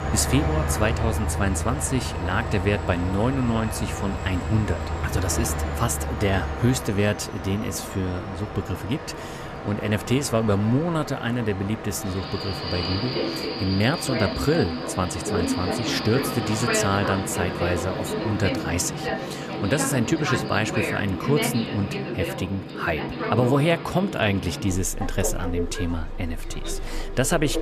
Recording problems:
train or aircraft noise; loud; throughout; 4 dB below the speech

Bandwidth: 14.5 kHz